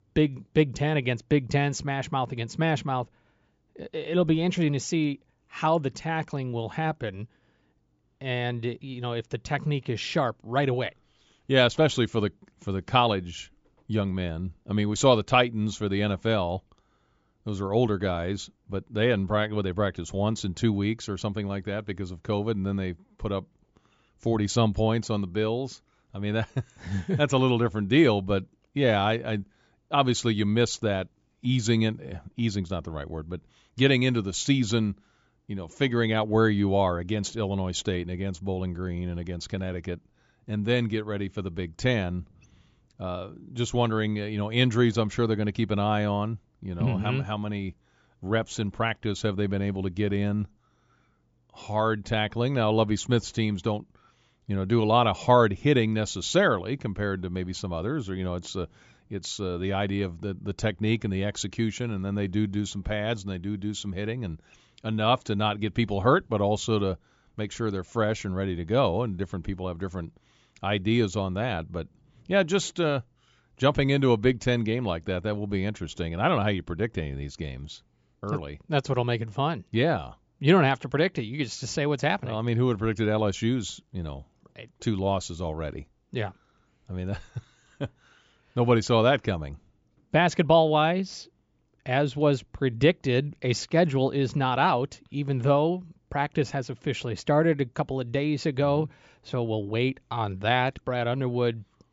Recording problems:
high frequencies cut off; noticeable; nothing above 7.5 kHz

